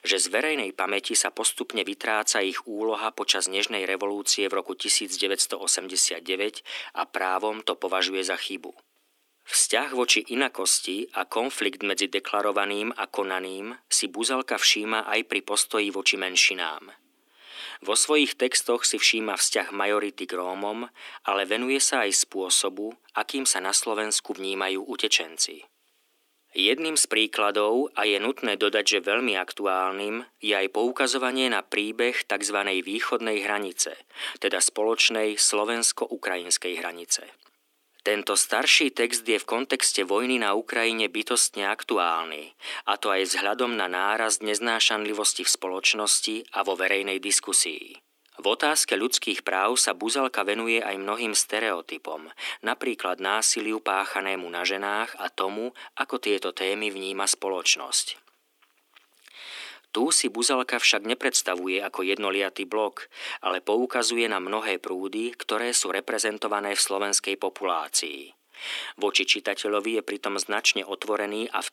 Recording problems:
thin; somewhat; fading below 250 Hz

